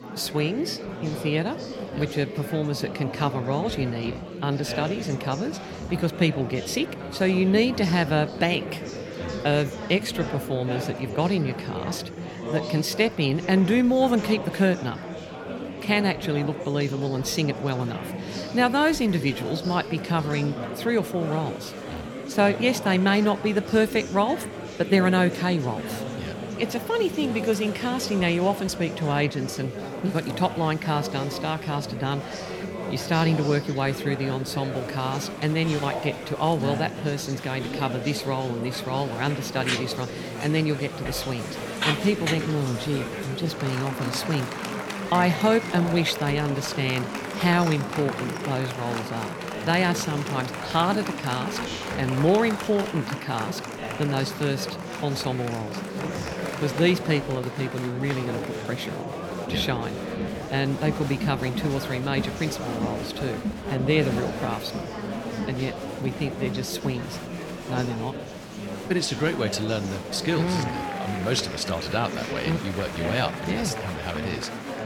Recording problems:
murmuring crowd; loud; throughout; 7 dB below the speech

